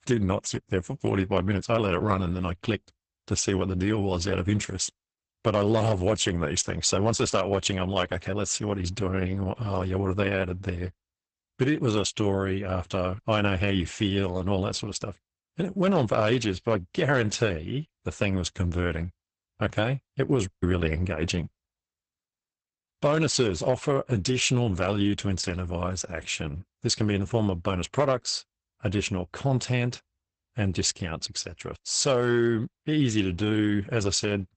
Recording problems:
garbled, watery; badly; nothing above 8 kHz

